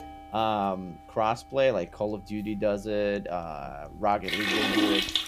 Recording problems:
household noises; very loud; throughout; 3 dB above the speech

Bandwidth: 15 kHz